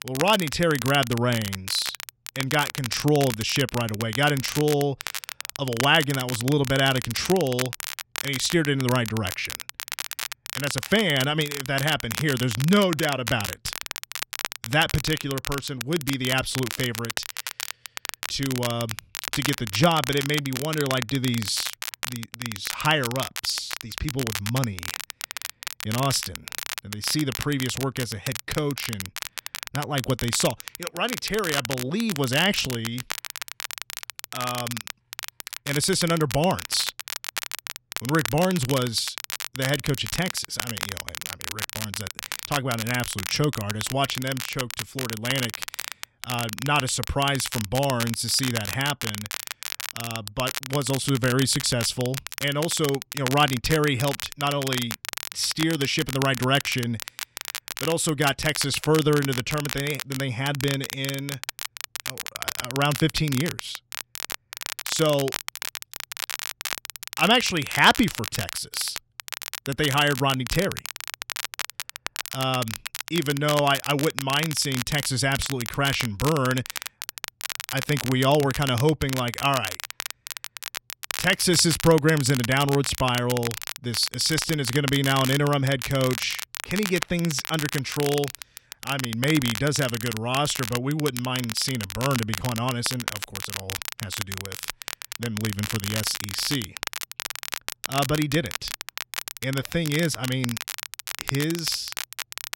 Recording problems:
crackle, like an old record; loud; 7 dB below the speech

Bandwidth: 16 kHz